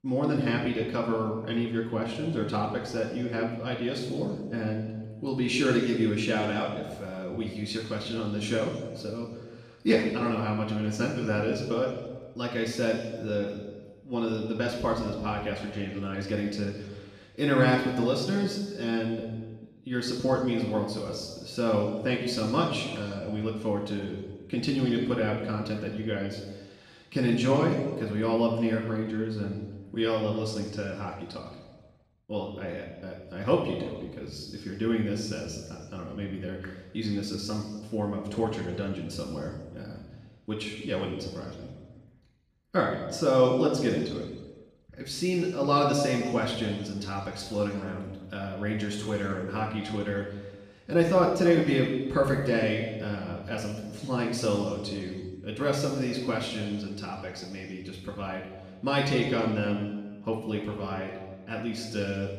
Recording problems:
off-mic speech; far
room echo; noticeable; dies away in 1.2 s

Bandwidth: 15 kHz